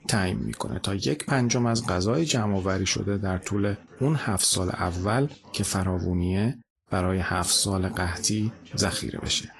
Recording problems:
garbled, watery; slightly; nothing above 11.5 kHz
voice in the background; faint; throughout; 25 dB below the speech

